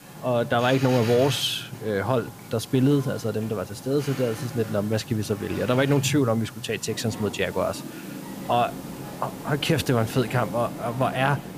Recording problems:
train or aircraft noise; noticeable; throughout; 10 dB below the speech
hiss; faint; throughout; 20 dB below the speech

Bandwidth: 15 kHz